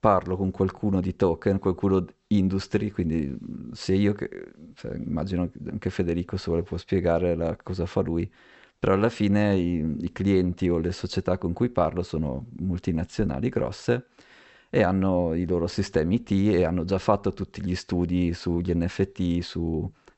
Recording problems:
high frequencies cut off; noticeable; nothing above 8 kHz

